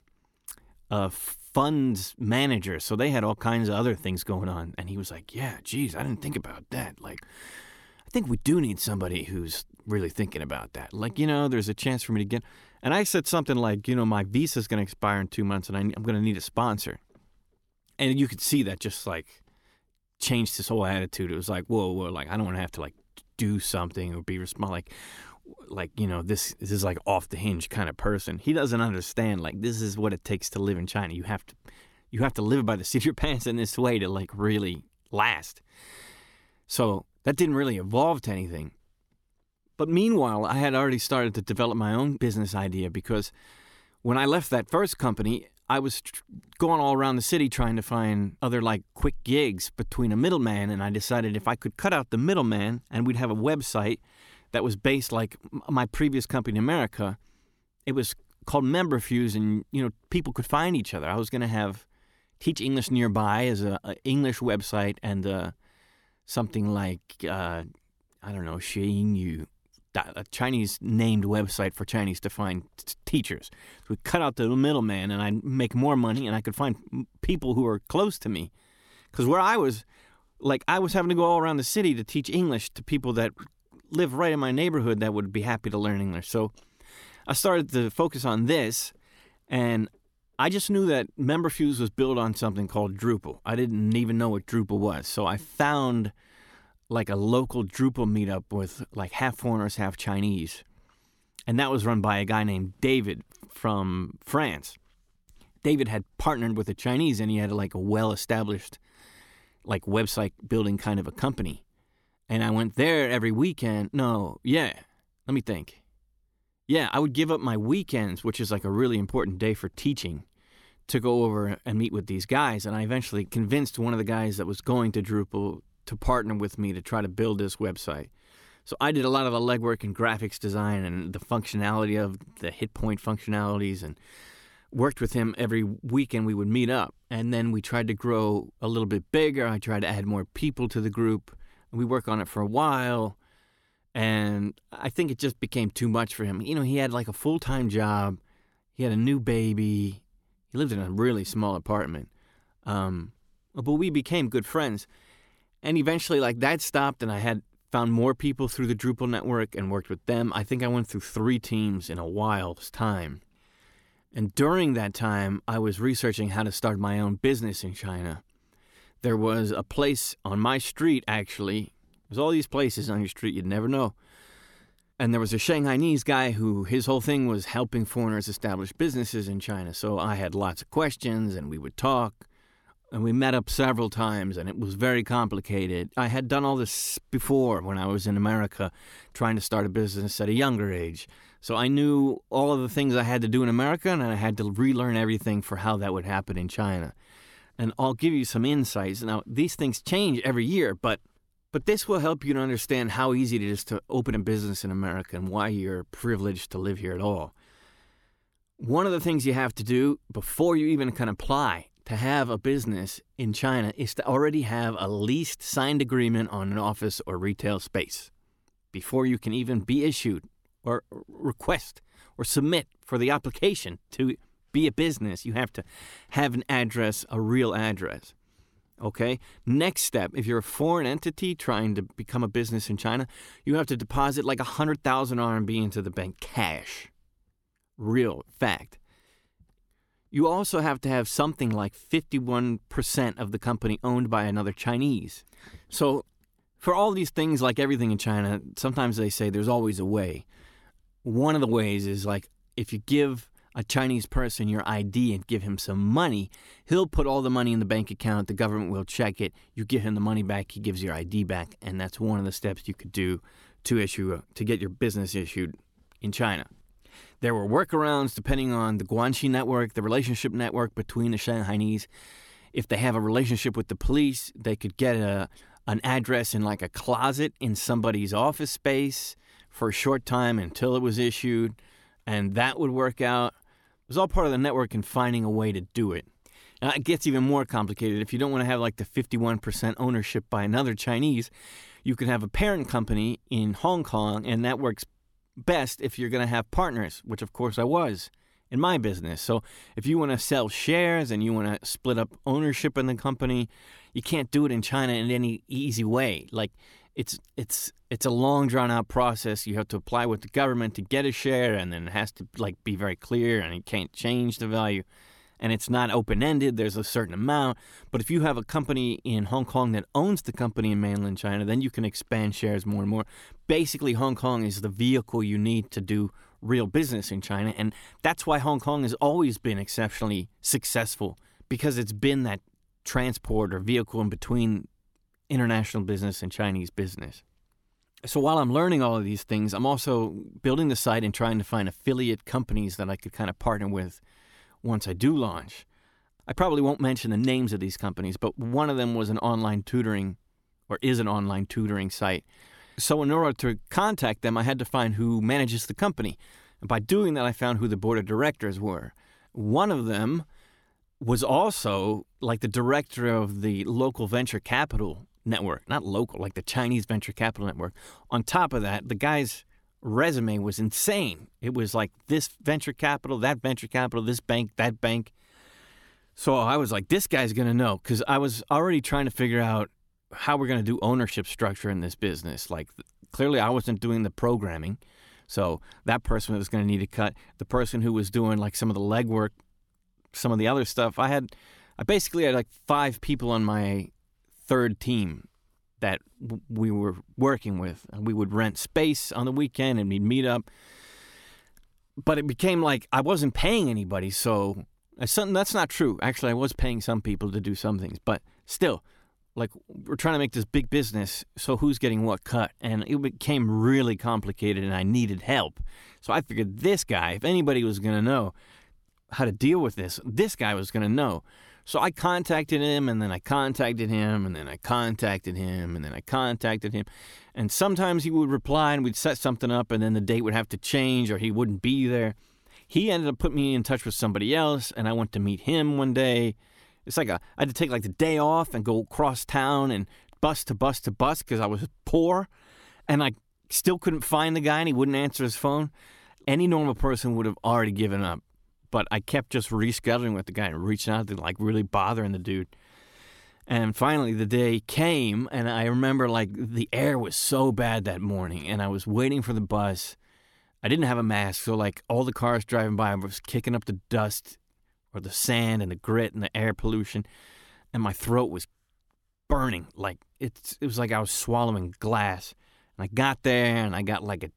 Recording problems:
none

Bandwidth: 17.5 kHz